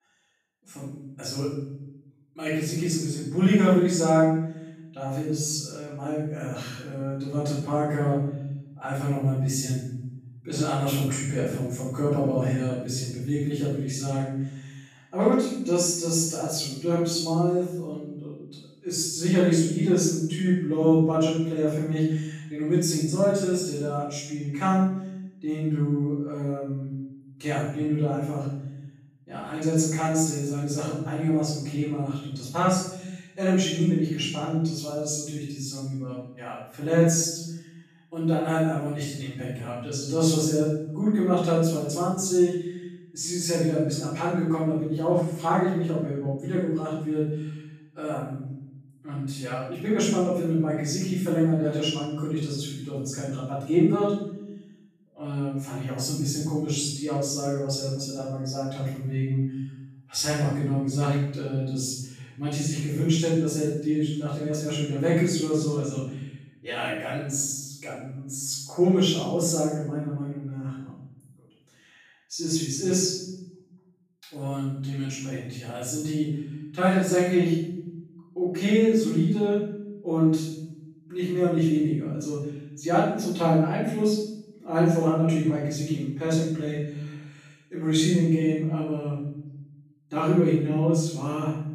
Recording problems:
room echo; strong; dies away in 0.8 s
off-mic speech; far

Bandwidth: 14.5 kHz